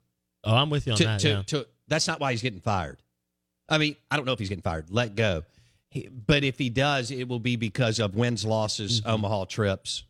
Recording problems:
uneven, jittery; strongly; from 2 to 8.5 s

